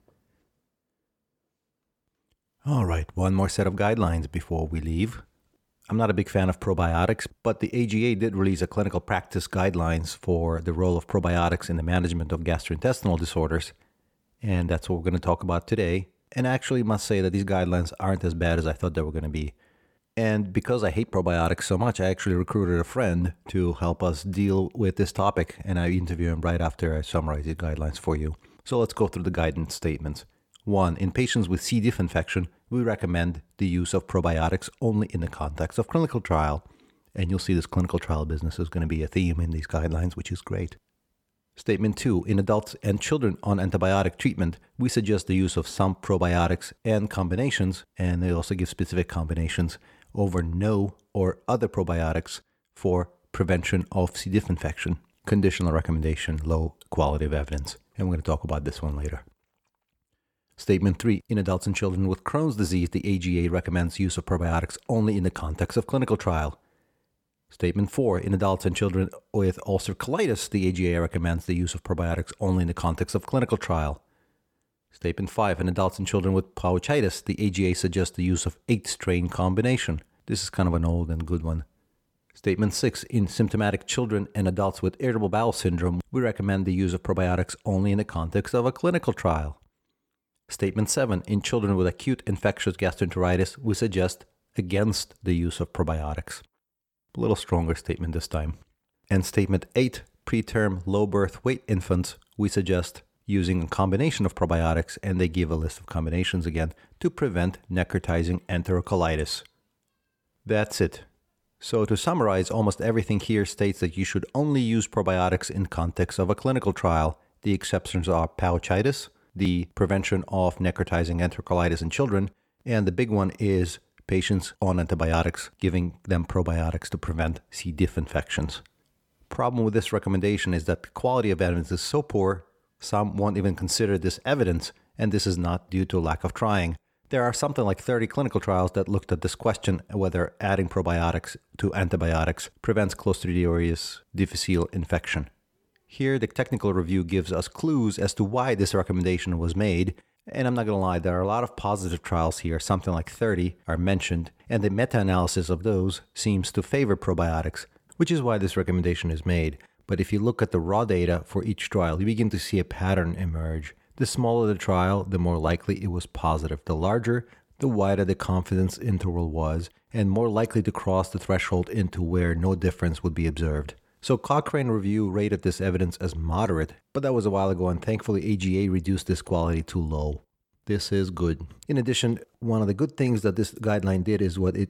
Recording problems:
none

